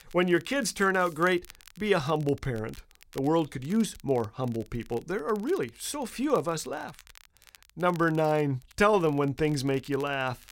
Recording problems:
crackle, like an old record; faint; 25 dB below the speech

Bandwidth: 16 kHz